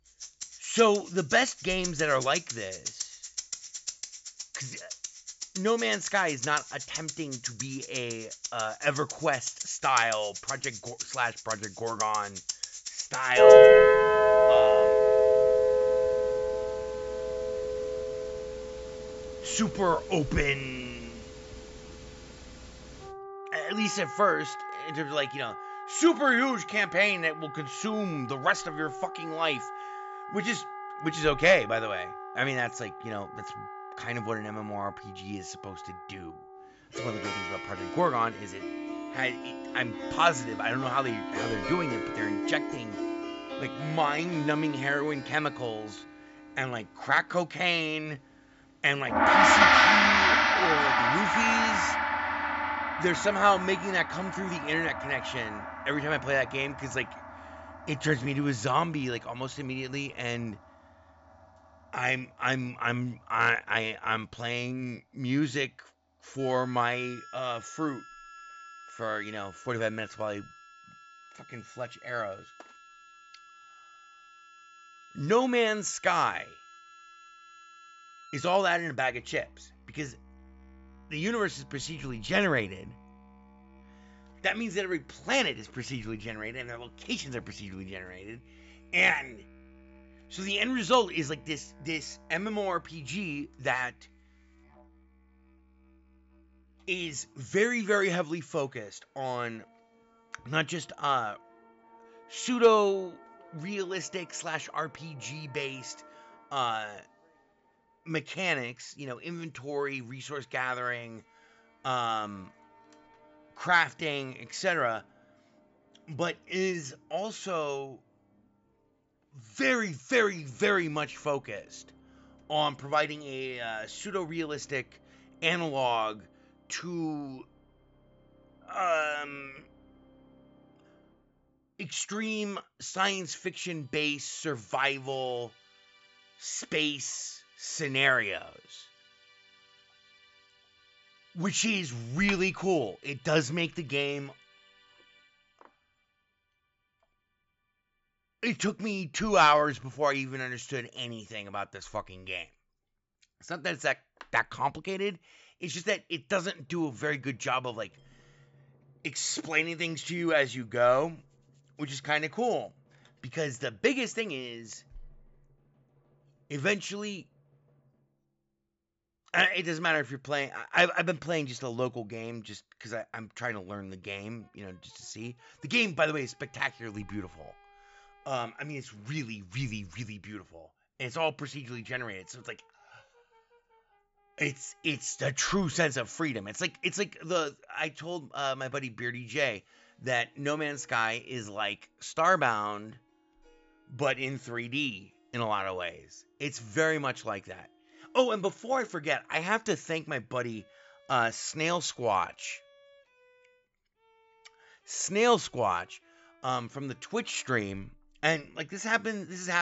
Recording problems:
high frequencies cut off; noticeable; nothing above 8 kHz
background music; very loud; throughout; 3 dB above the speech
abrupt cut into speech; at the end

